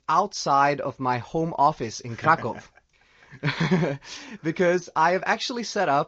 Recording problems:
garbled, watery; slightly; nothing above 6.5 kHz

